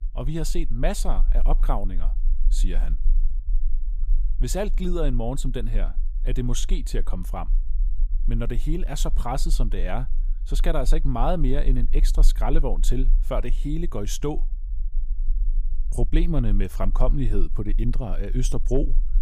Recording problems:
low rumble; faint; throughout; 25 dB below the speech

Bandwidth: 15 kHz